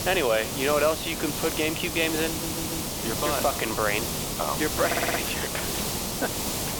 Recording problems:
thin; somewhat; fading below 450 Hz
hiss; loud; throughout; 1 dB below the speech
audio stuttering; at 2.5 s and at 5 s

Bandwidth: 18.5 kHz